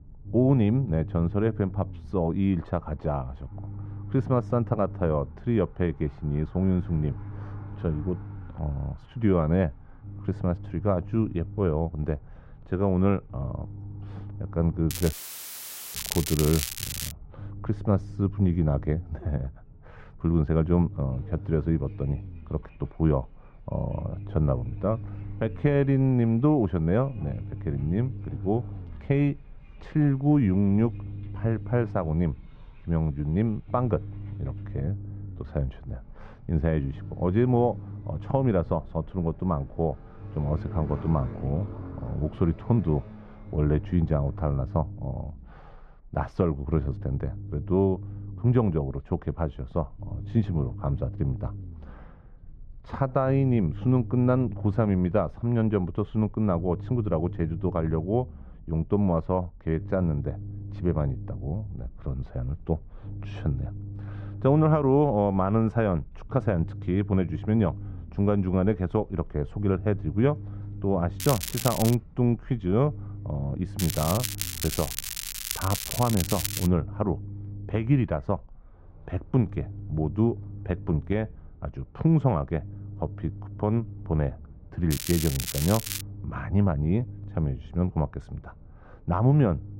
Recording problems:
muffled; very; fading above 1 kHz
crackling; loud; 4 times, first at 15 s; 5 dB below the speech
traffic noise; faint; throughout; 25 dB below the speech
low rumble; faint; throughout; 20 dB below the speech
audio cutting out; filled with static; at 15 s for 1 s

